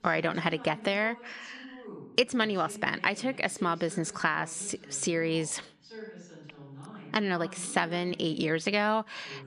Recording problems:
voice in the background; noticeable; throughout; 20 dB below the speech

